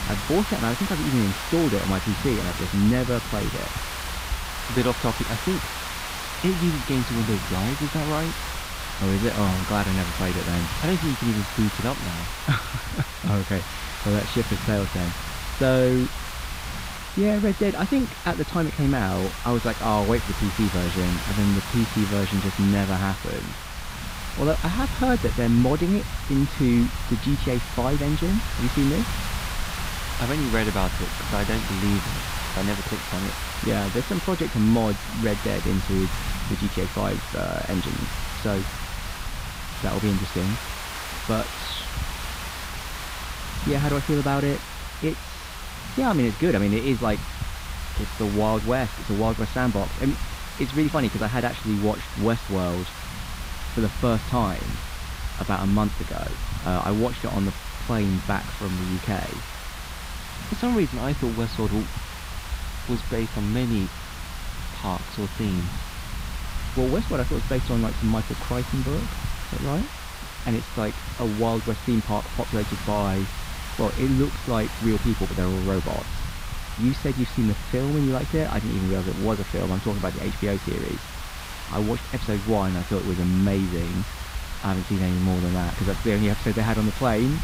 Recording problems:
muffled; slightly; fading above 4 kHz
hiss; loud; throughout; 8 dB below the speech
low rumble; faint; throughout; 20 dB below the speech

